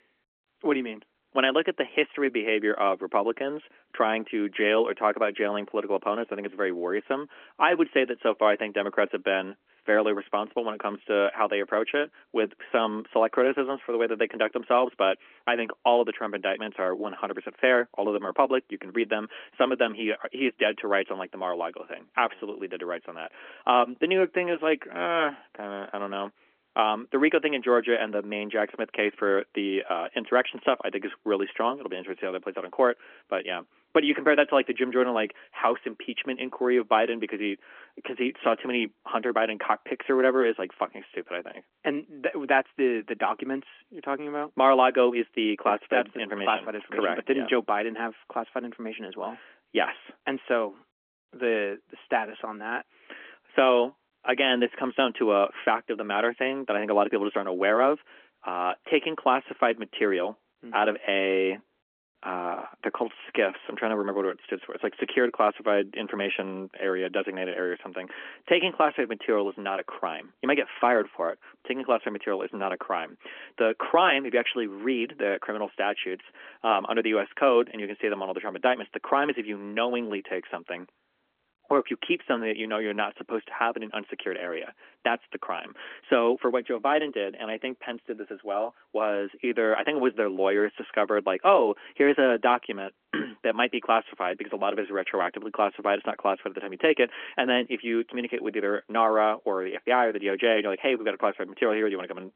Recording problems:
phone-call audio; nothing above 3.5 kHz

